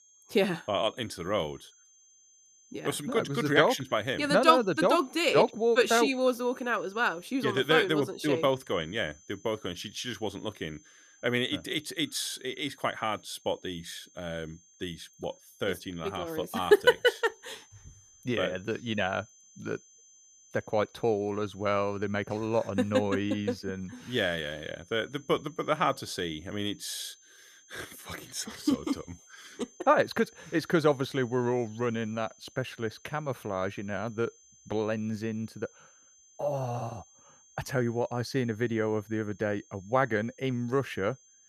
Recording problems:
high-pitched whine; faint; throughout; 6.5 kHz, 25 dB below the speech

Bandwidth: 14.5 kHz